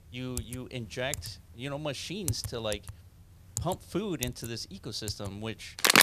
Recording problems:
household noises; very loud; throughout; 3 dB above the speech

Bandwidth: 14.5 kHz